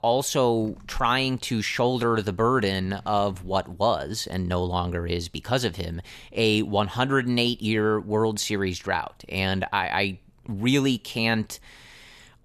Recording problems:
none

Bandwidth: 14 kHz